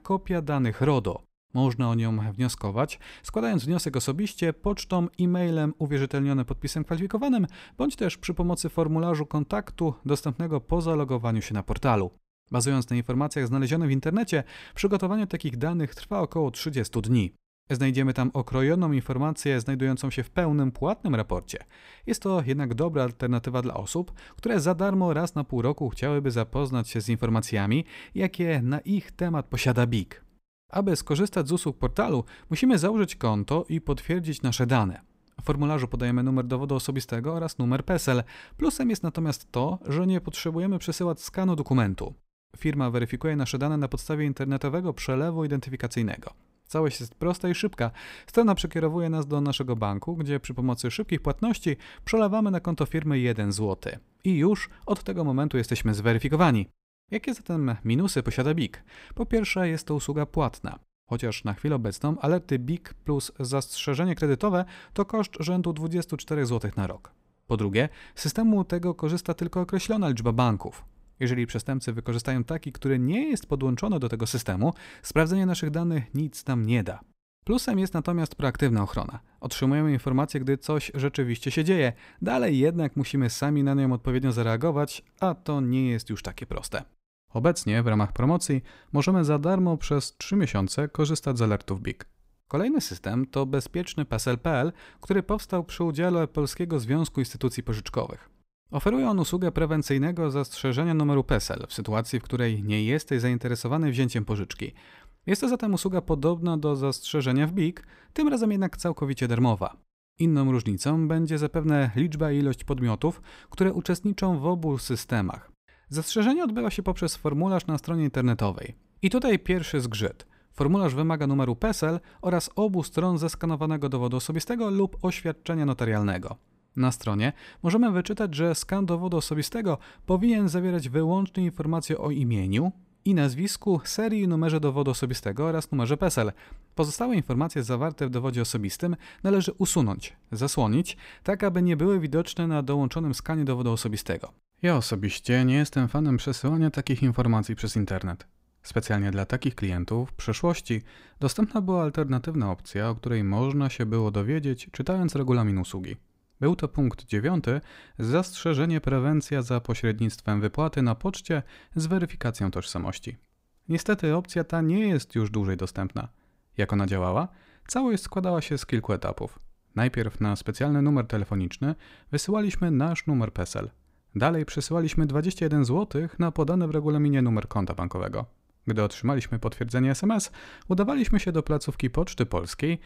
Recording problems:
none

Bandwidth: 15.5 kHz